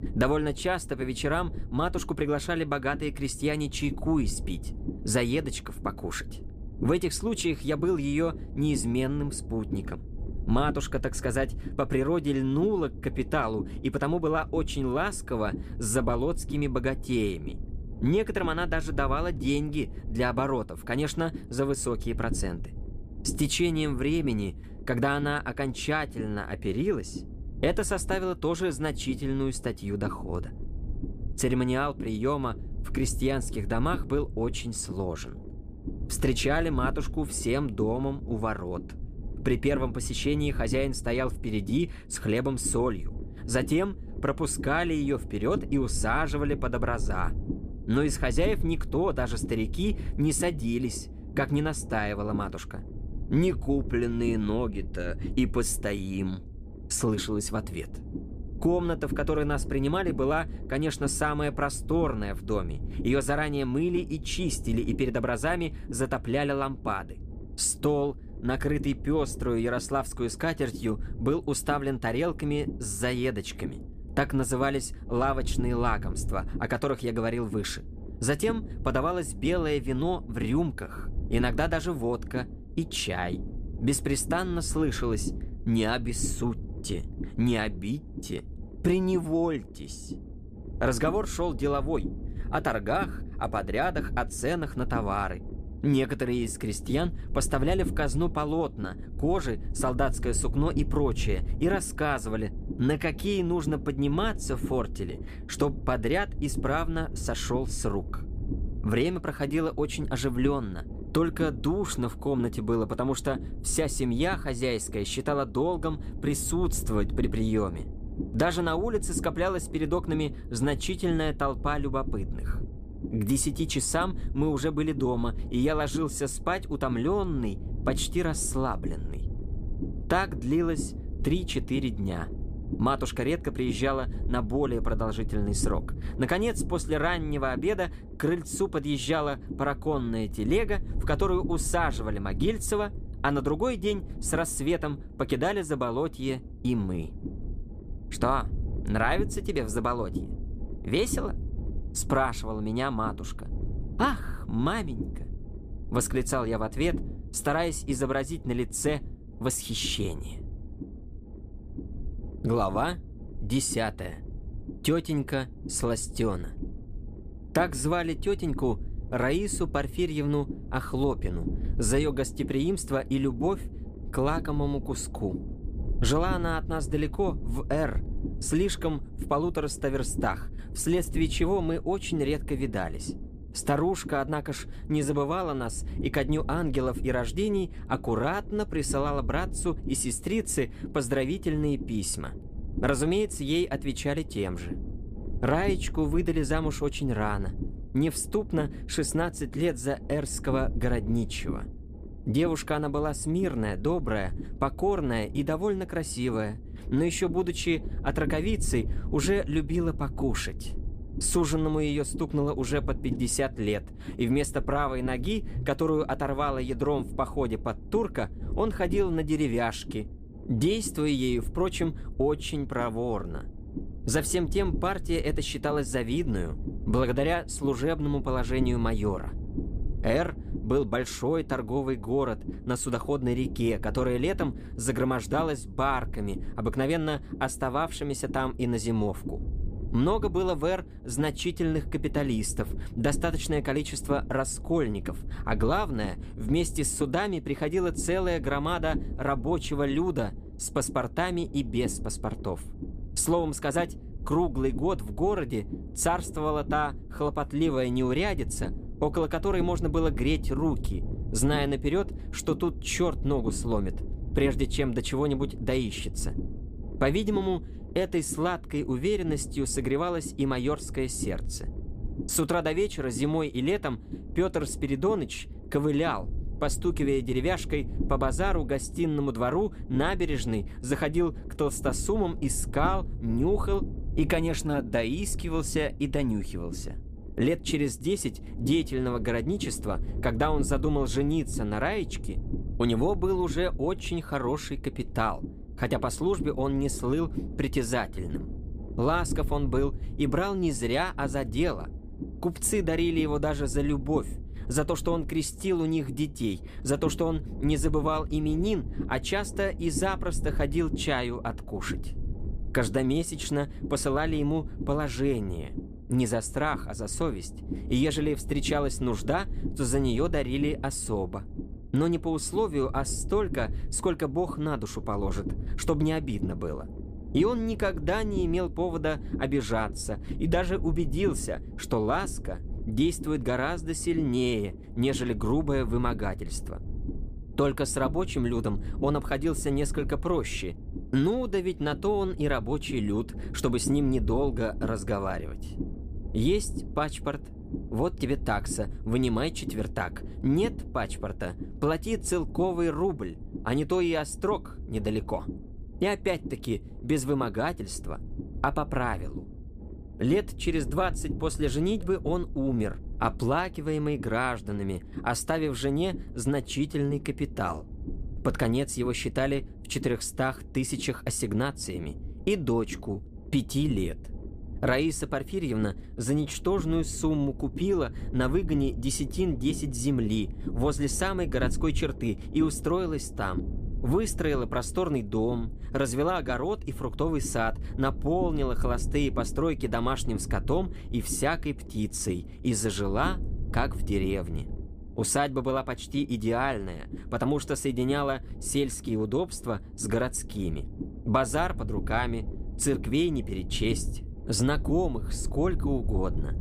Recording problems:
low rumble; noticeable; throughout; 15 dB below the speech

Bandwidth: 15 kHz